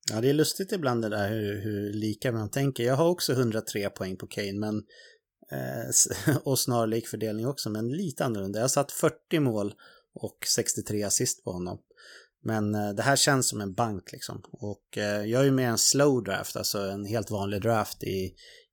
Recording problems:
none

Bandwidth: 17.5 kHz